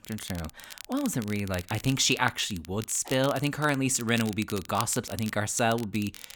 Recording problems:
crackle, like an old record; noticeable; 15 dB below the speech

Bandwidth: 18.5 kHz